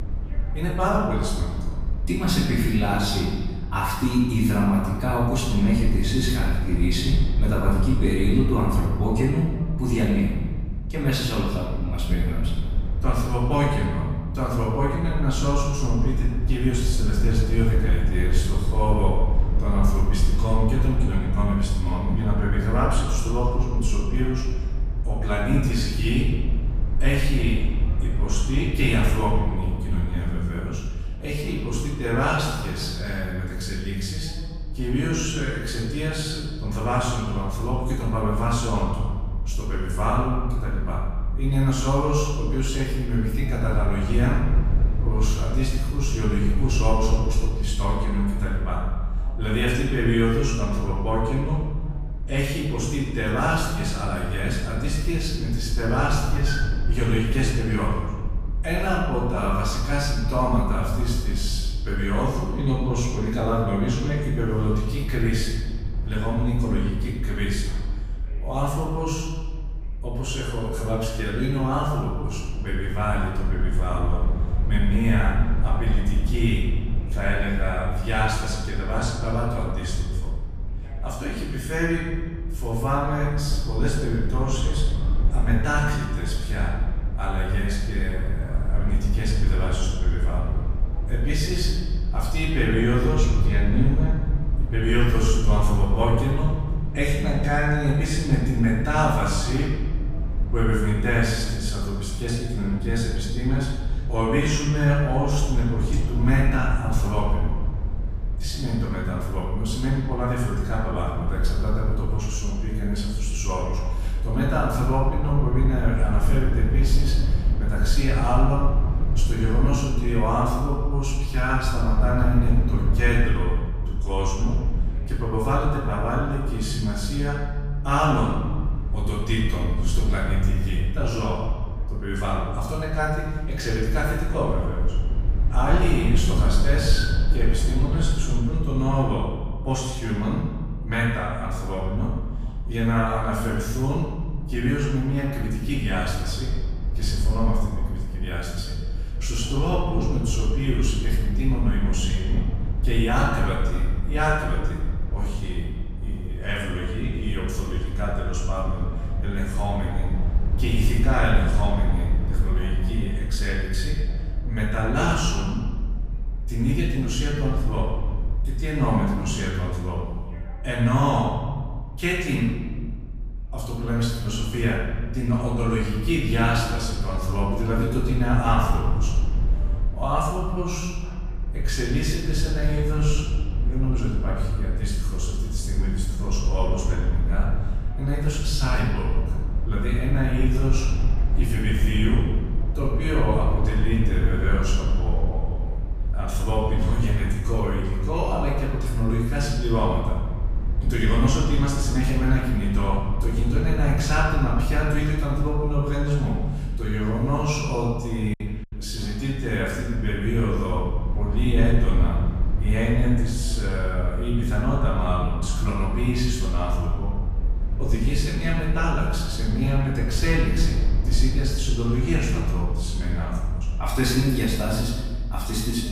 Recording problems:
off-mic speech; far
room echo; noticeable; dies away in 1.3 s
low rumble; noticeable; throughout; 15 dB below the speech
voice in the background; faint; throughout; 30 dB below the speech
choppy; occasionally; at 3:28; 3% of the speech affected

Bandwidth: 15 kHz